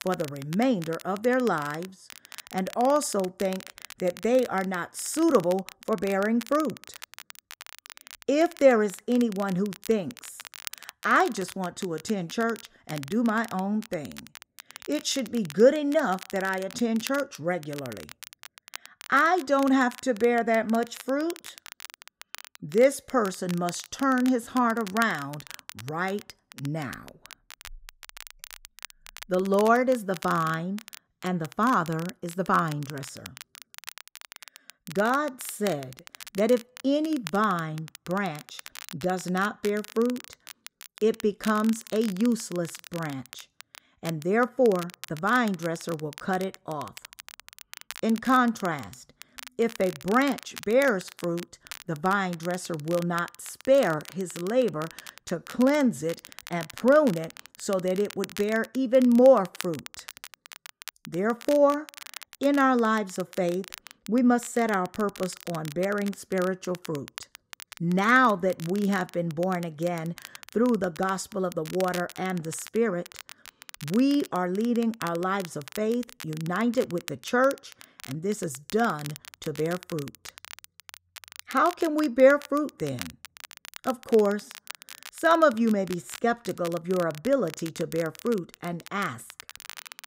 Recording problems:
crackle, like an old record; noticeable; 15 dB below the speech

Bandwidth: 15.5 kHz